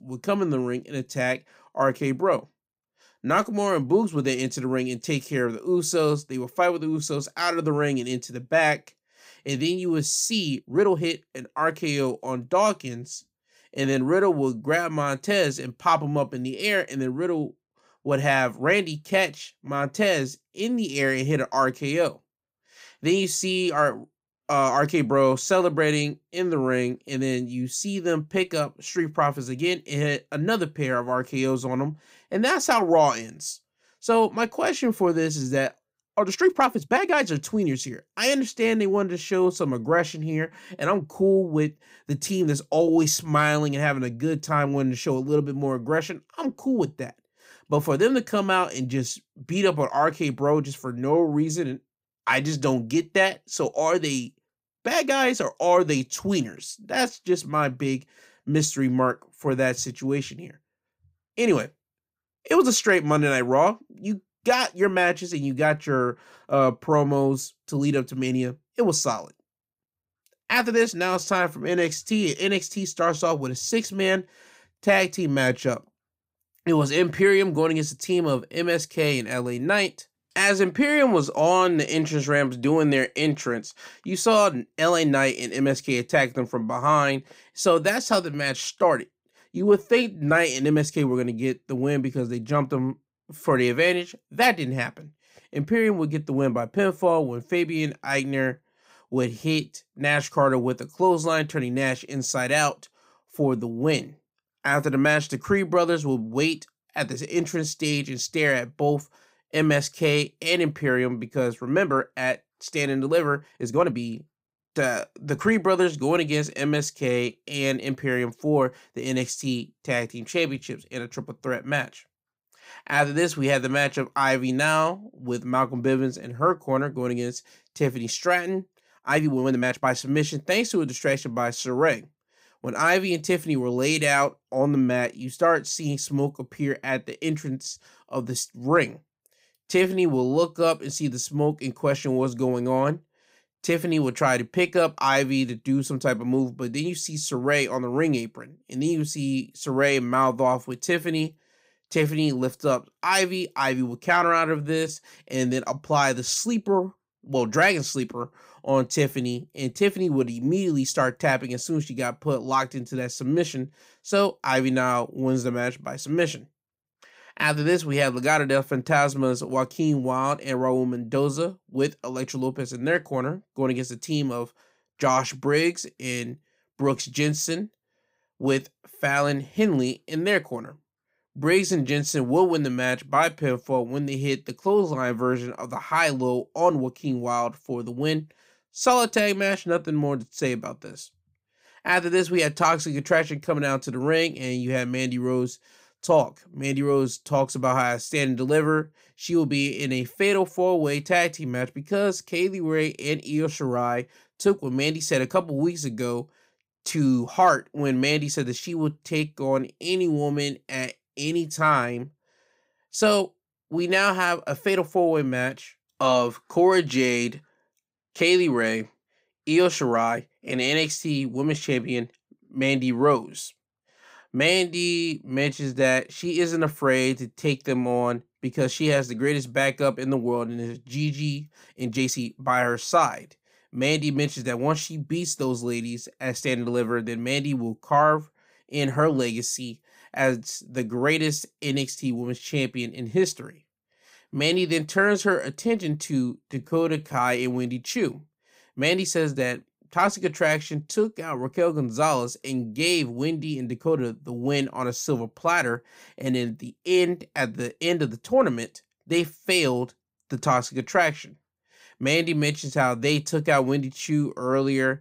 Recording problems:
uneven, jittery; strongly; from 11 s to 4:07

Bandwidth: 15.5 kHz